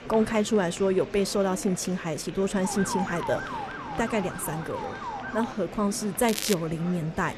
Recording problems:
crackling; loud; at 6.5 s; 6 dB below the speech
murmuring crowd; noticeable; throughout; 15 dB below the speech
siren; noticeable; from 2.5 to 5.5 s; peak 5 dB below the speech

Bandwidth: 13.5 kHz